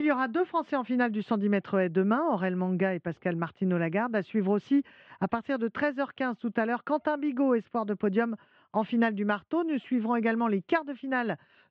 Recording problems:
muffled; very; fading above 3 kHz
abrupt cut into speech; at the start

